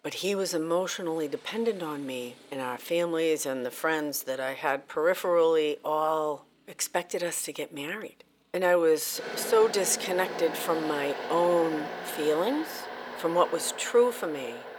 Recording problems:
thin; somewhat; fading below 500 Hz
traffic noise; loud; throughout; 9 dB below the speech

